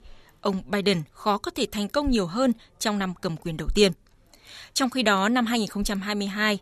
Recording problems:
none

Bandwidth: 13.5 kHz